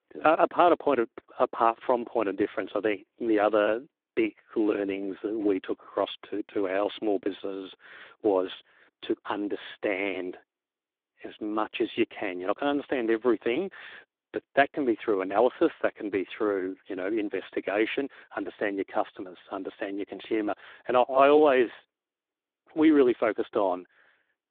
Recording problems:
phone-call audio

